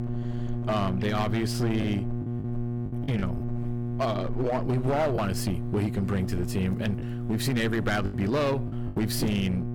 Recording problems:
distortion; slight; 14% of the sound clipped
electrical hum; loud; throughout; 60 Hz, 9 dB below the speech
choppy; occasionally; 3% of the speech affected

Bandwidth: 18 kHz